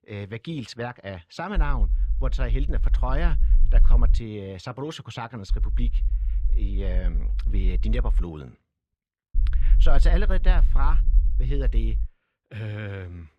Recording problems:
low rumble; noticeable; from 1.5 to 4 s, from 5.5 to 8 s and from 9.5 to 12 s; 15 dB below the speech

